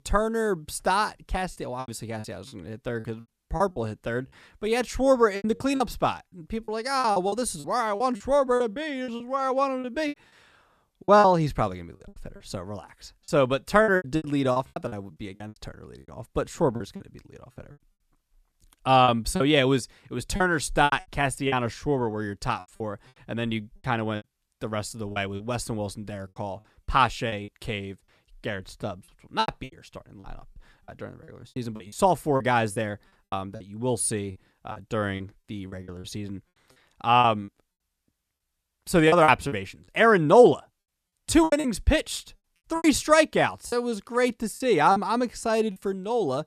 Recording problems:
choppy; very; 11% of the speech affected

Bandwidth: 14 kHz